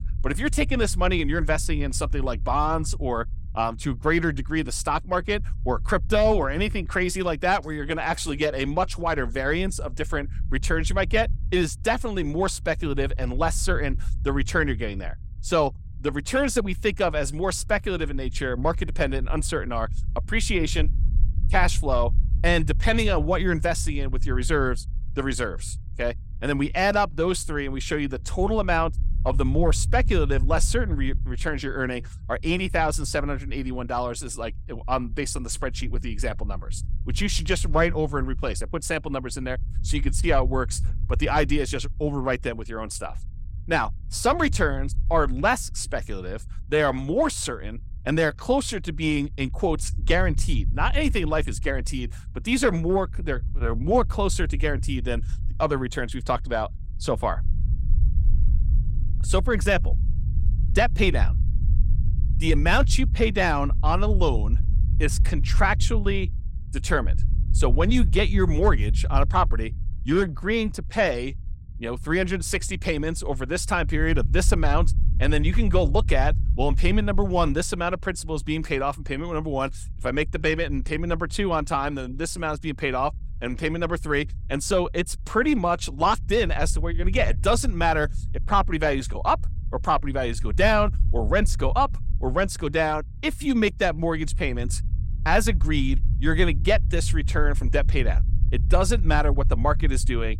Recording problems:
low rumble; faint; throughout; 20 dB below the speech

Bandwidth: 16 kHz